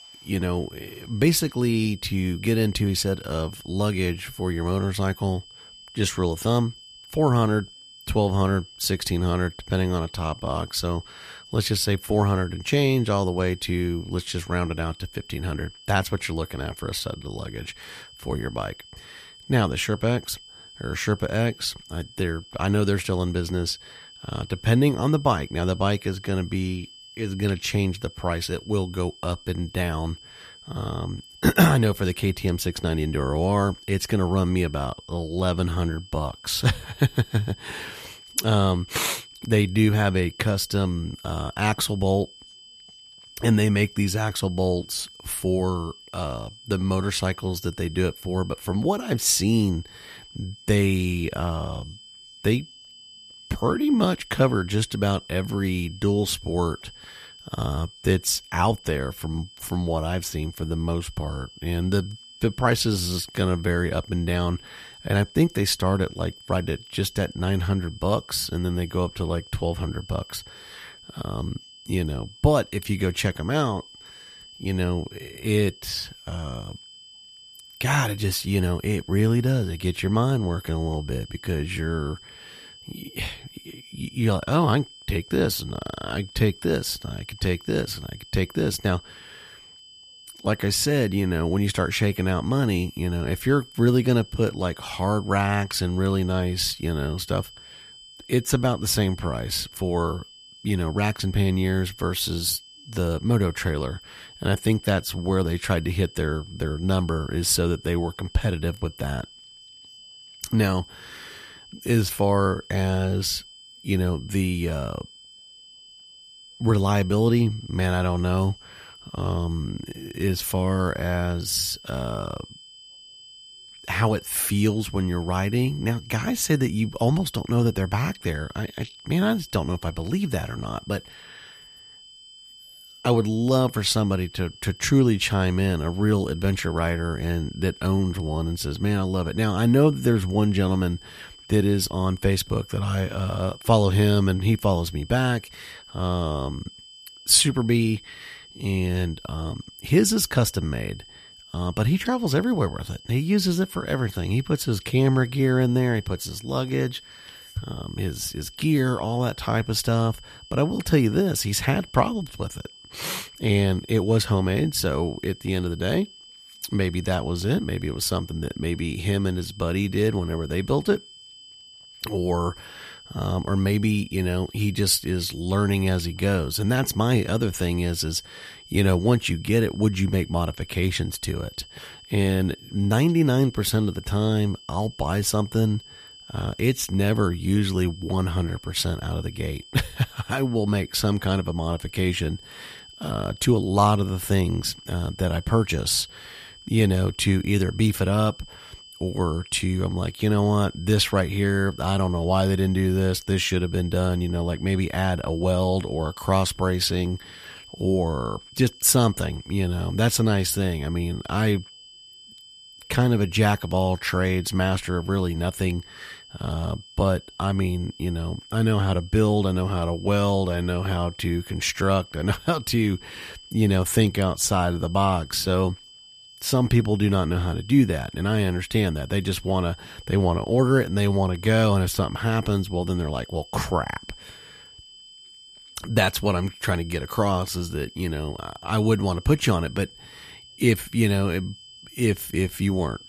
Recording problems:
high-pitched whine; faint; throughout; 3 kHz, 20 dB below the speech

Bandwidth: 14.5 kHz